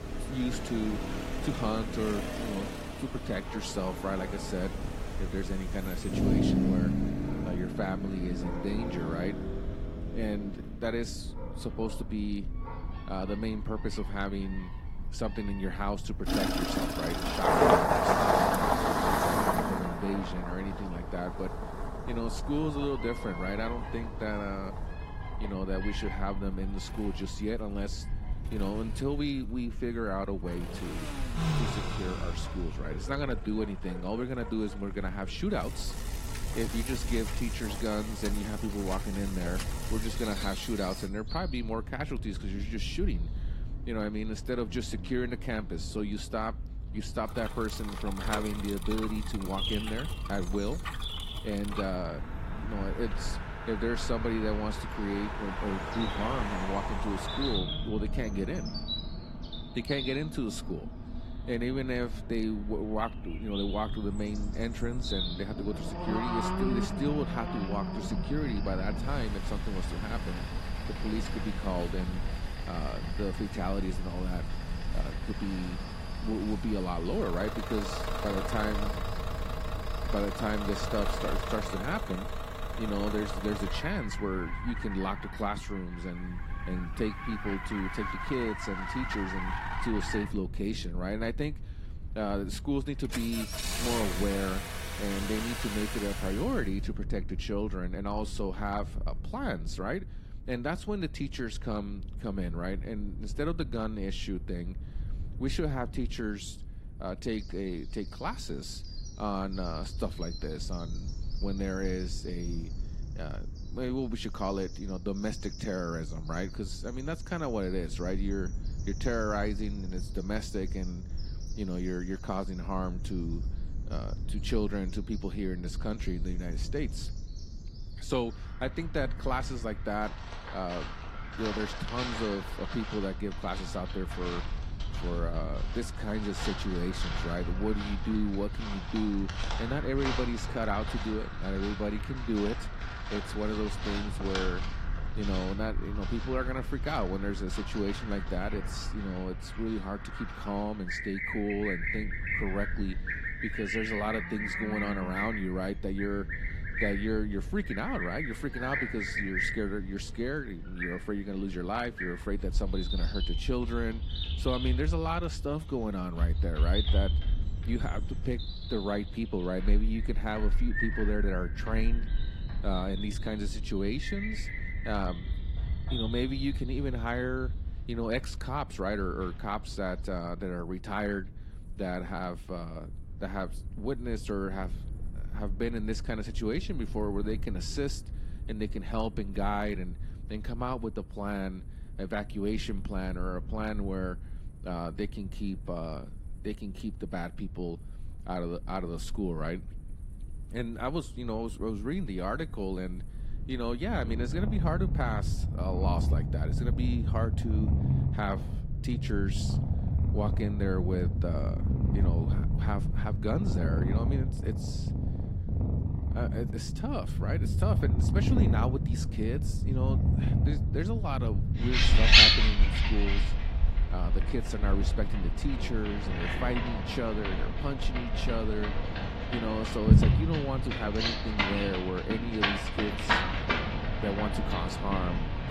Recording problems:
garbled, watery; slightly
animal sounds; very loud; throughout; 3 dB above the speech
traffic noise; loud; until 1:36; 1 dB below the speech
low rumble; noticeable; throughout; 20 dB below the speech

